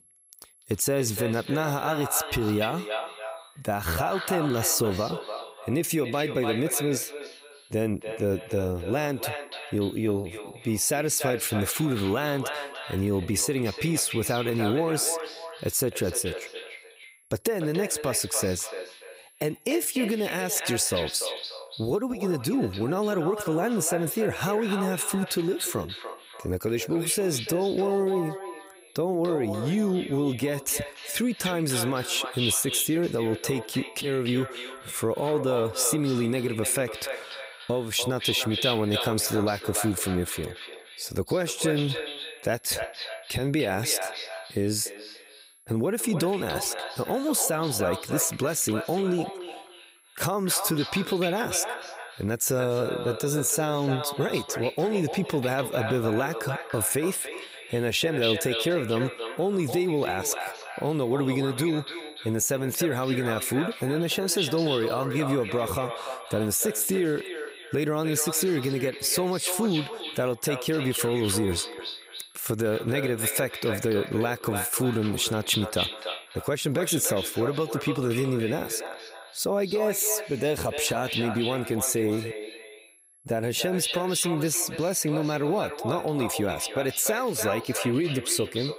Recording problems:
echo of what is said; strong; throughout; 290 ms later, 8 dB below the speech
high-pitched whine; faint; throughout; 11 kHz, 30 dB below the speech

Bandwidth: 15.5 kHz